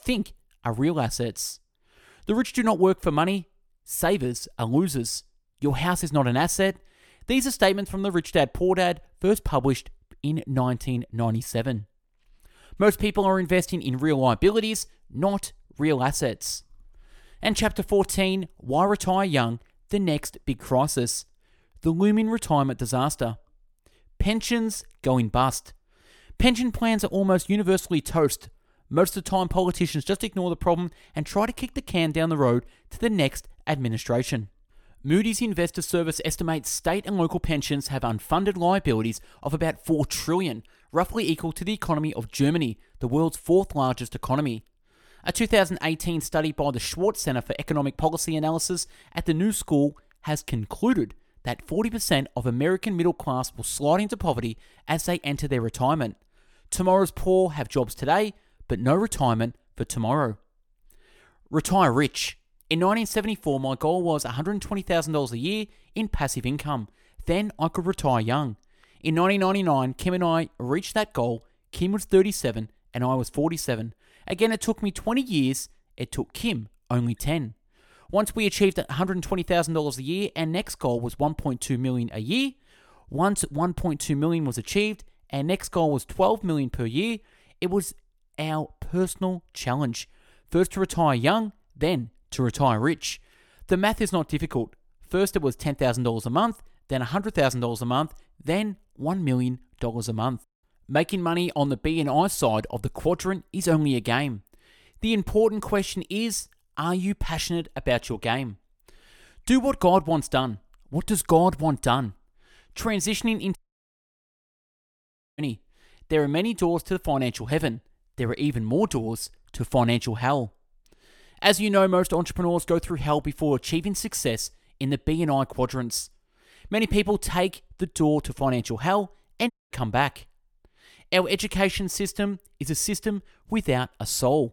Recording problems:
audio cutting out; at 1:54 for 2 s and at 2:10

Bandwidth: 18 kHz